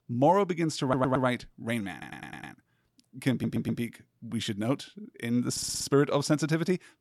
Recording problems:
audio stuttering; 4 times, first at 1 s

